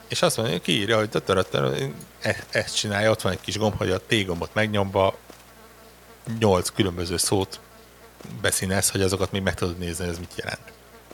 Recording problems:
electrical hum; faint; throughout; 60 Hz, 25 dB below the speech
hiss; faint; throughout; 30 dB below the speech

